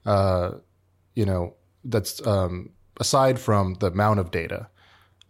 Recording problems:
none

